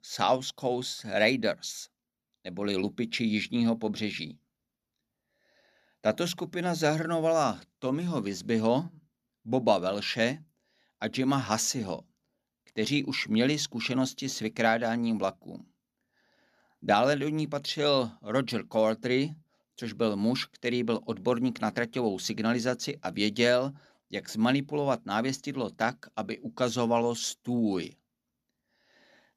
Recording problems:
none

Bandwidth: 14.5 kHz